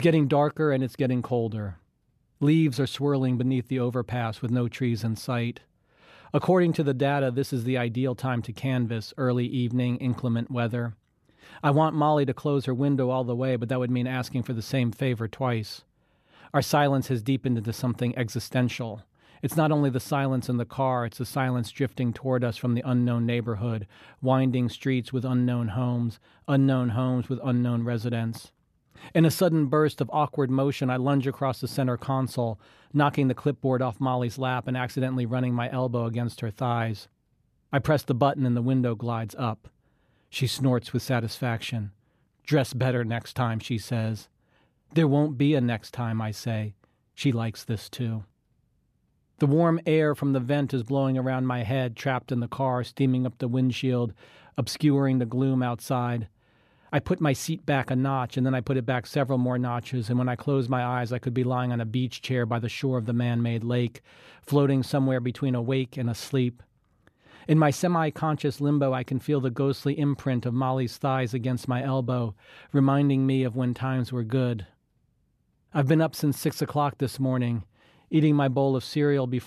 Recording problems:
abrupt cut into speech; at the start

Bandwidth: 14 kHz